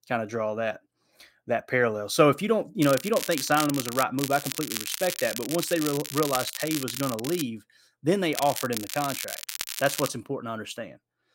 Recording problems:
crackling; loud; from 3 to 4 s, from 4 to 7.5 s and from 8.5 to 10 s; 6 dB below the speech

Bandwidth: 16 kHz